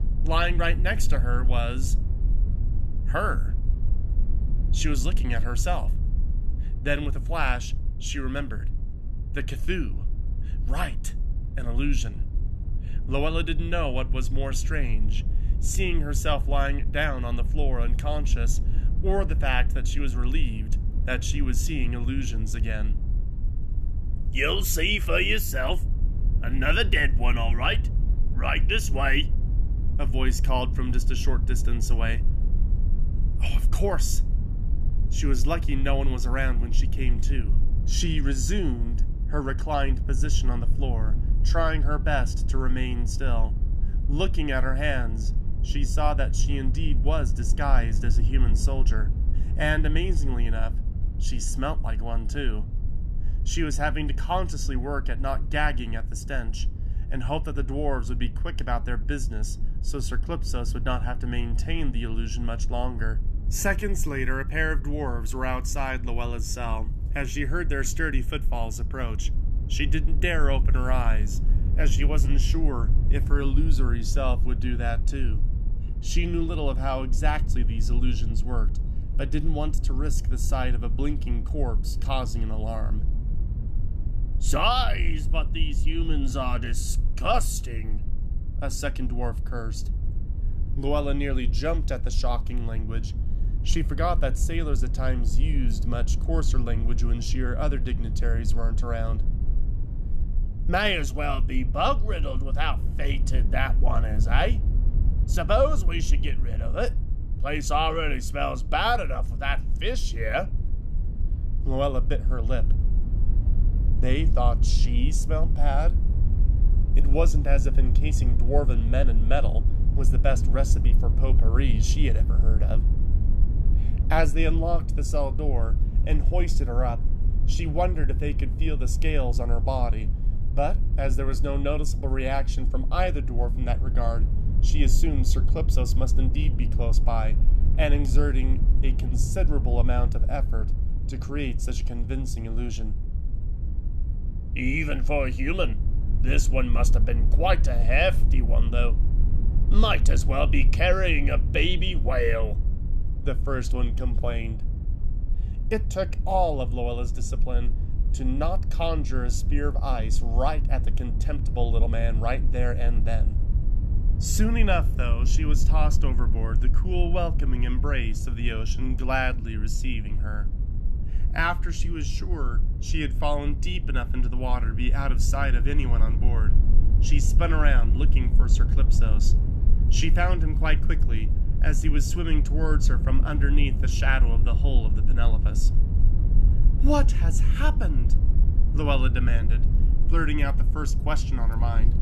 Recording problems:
low rumble; noticeable; throughout; 15 dB below the speech

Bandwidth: 13.5 kHz